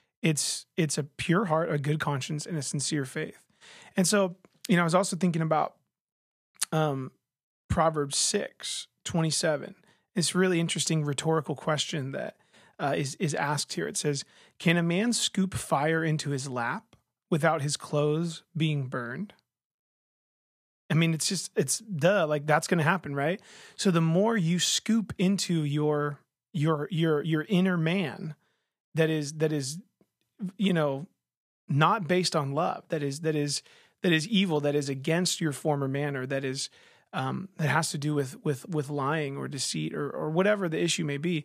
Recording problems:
none

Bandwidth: 14.5 kHz